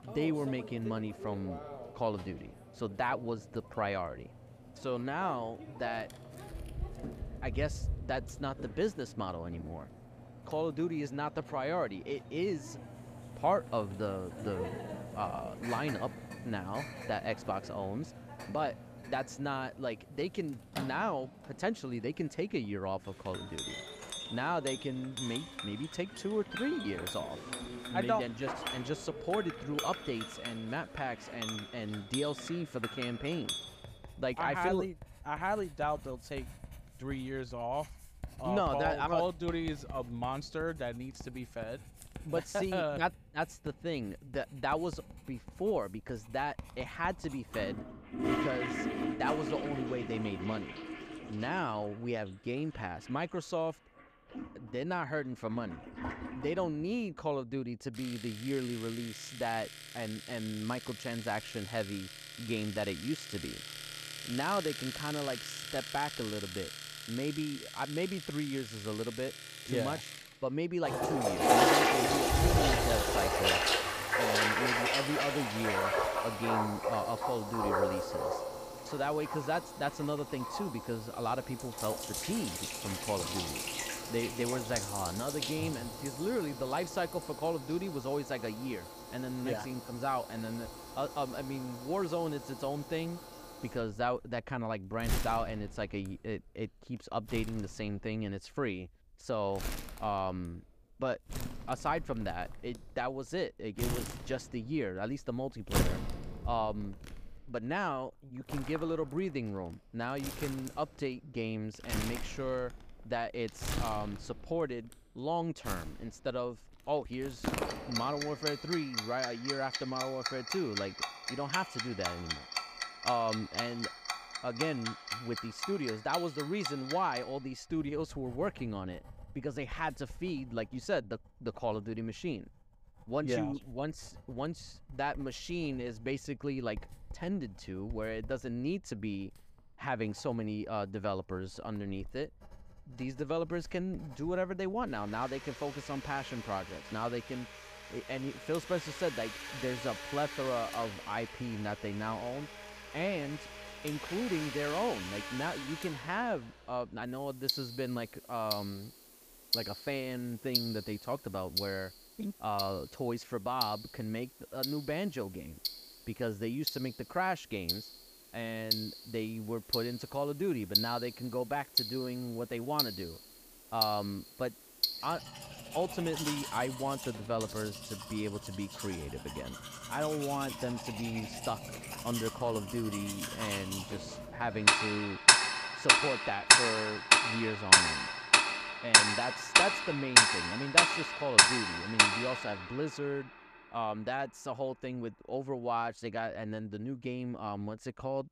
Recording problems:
household noises; very loud; throughout; 4 dB above the speech

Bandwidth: 15 kHz